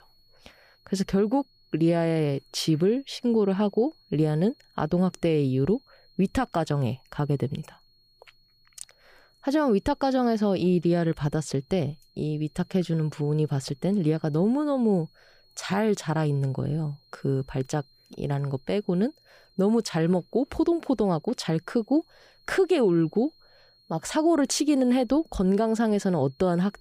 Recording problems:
high-pitched whine; faint; throughout; 4.5 kHz, 35 dB below the speech

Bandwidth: 15 kHz